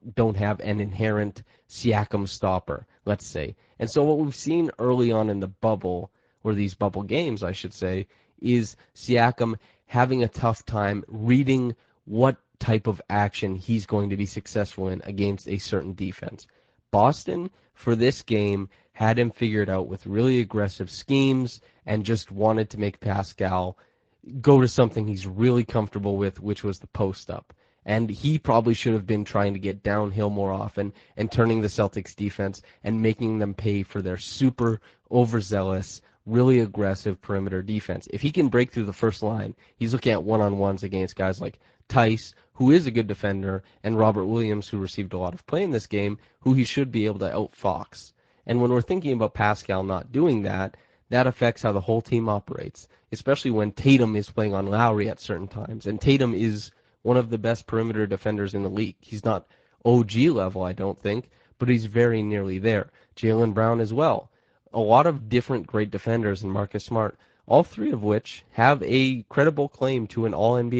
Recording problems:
garbled, watery; slightly
abrupt cut into speech; at the end

